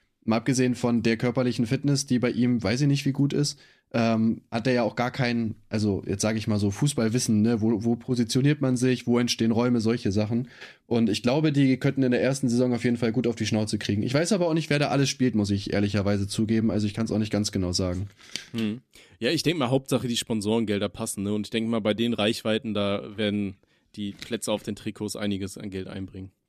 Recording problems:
none

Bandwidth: 14.5 kHz